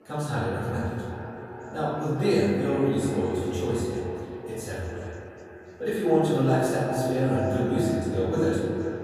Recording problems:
echo of what is said; strong; throughout; 380 ms later, 8 dB below the speech
room echo; strong; dies away in 1.7 s
off-mic speech; far
background chatter; faint; throughout; 4 voices, 25 dB below the speech

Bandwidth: 14.5 kHz